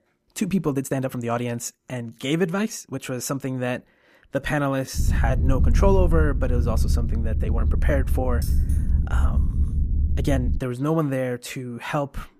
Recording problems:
low rumble; noticeable; from 5 to 11 s; 10 dB below the speech
uneven, jittery; strongly; from 0.5 to 11 s
jangling keys; faint; from 8.5 to 10 s; peak 15 dB below the speech

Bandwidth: 14.5 kHz